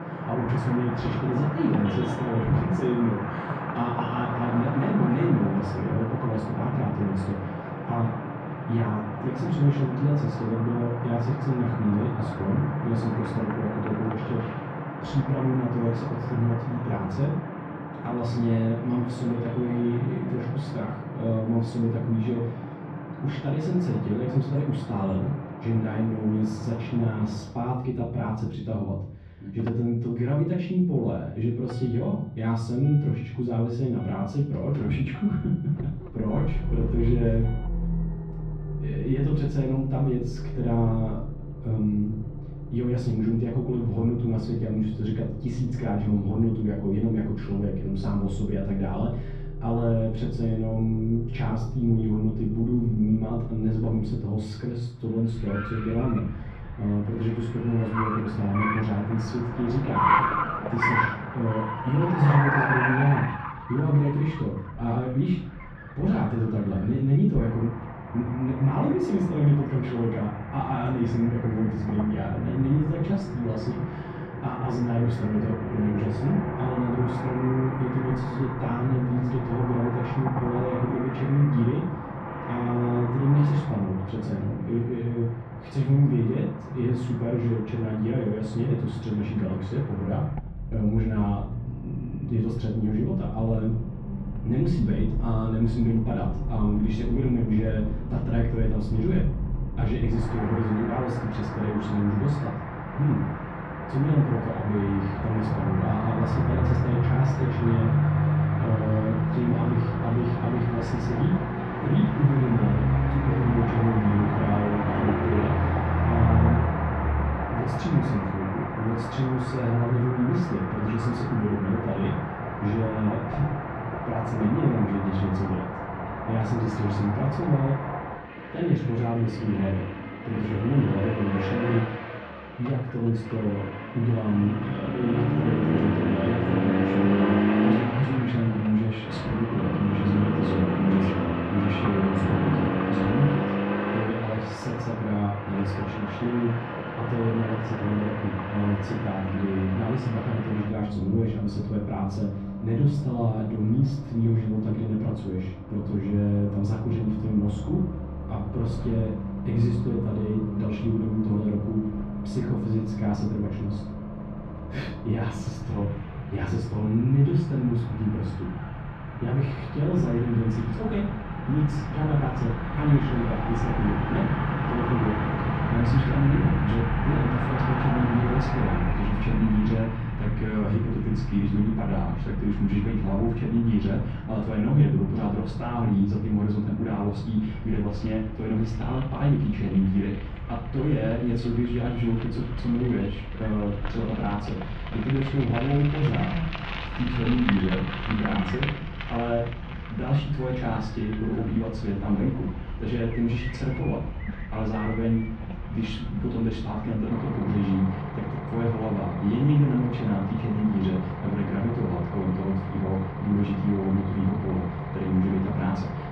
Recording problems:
off-mic speech; far
muffled; very; fading above 2.5 kHz
room echo; noticeable; dies away in 0.5 s
traffic noise; loud; throughout; 5 dB below the speech

